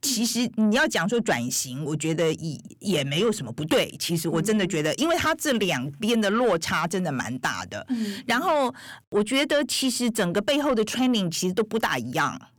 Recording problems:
distortion; slight; 10 dB below the speech

